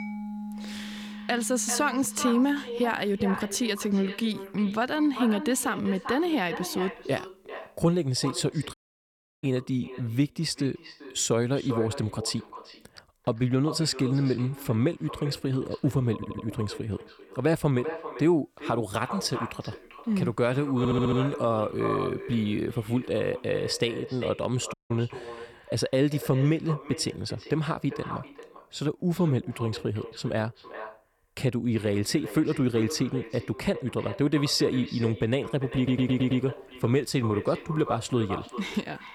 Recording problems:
echo of what is said; noticeable; throughout; 390 ms later, 10 dB below the speech
background music; noticeable; throughout; 15 dB below the speech
audio cutting out; at 8.5 s for 0.5 s and at 25 s
audio stuttering; at 16 s, at 21 s and at 36 s

